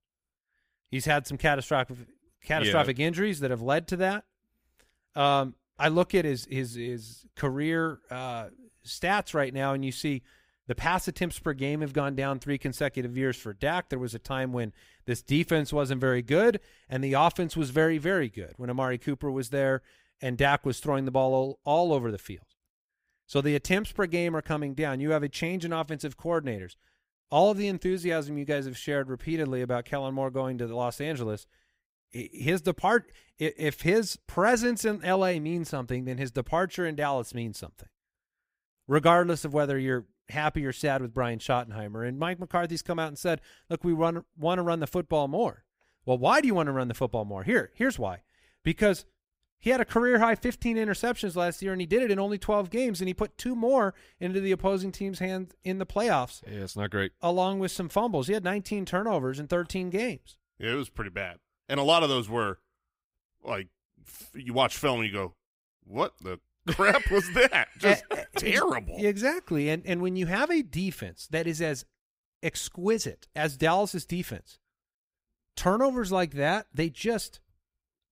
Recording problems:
none

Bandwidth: 15.5 kHz